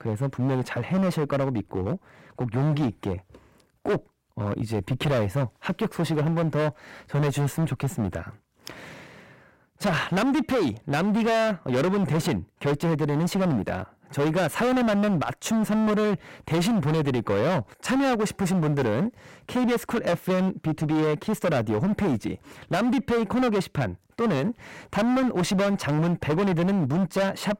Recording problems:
distortion; heavy; 22% of the sound clipped

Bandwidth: 16 kHz